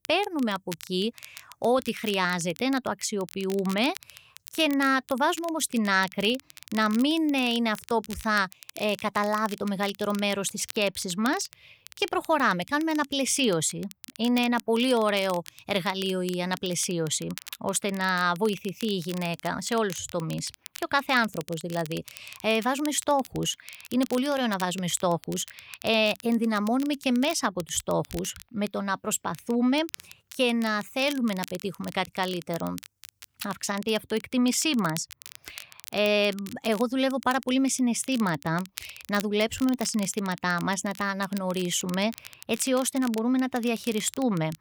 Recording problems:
crackle, like an old record; noticeable; 20 dB below the speech

